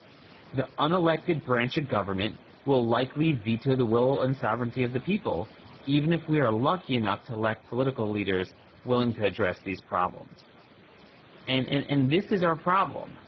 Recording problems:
garbled, watery; badly; nothing above 5.5 kHz
hiss; faint; throughout; 25 dB below the speech

